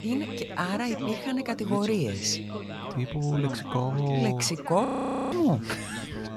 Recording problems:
background chatter; loud; throughout; 3 voices, 8 dB below the speech
audio freezing; at 5 s

